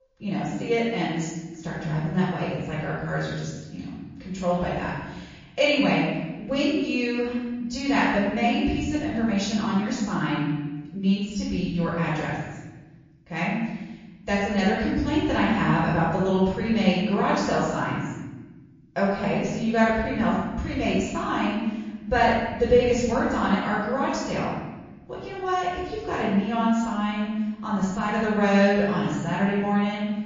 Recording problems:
room echo; strong; dies away in 1.2 s
off-mic speech; far
garbled, watery; slightly

